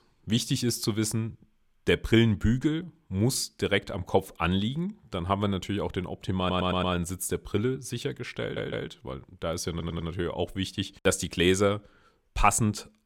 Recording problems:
audio stuttering; at 6.5 s, at 8.5 s and at 9.5 s

